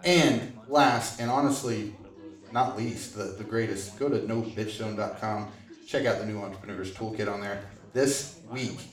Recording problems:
room echo; slight; dies away in 0.5 s
off-mic speech; somewhat distant
background chatter; faint; throughout; 2 voices, 20 dB below the speech

